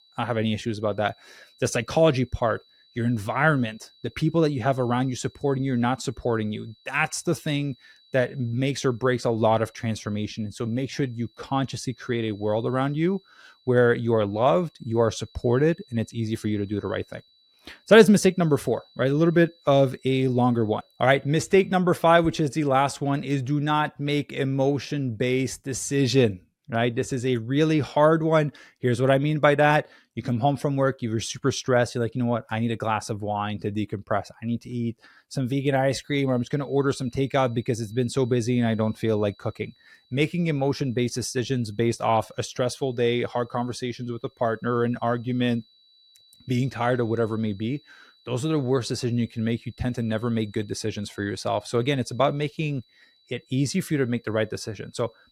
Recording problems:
high-pitched whine; faint; until 22 s and from 36 s on; 4 kHz, 30 dB below the speech

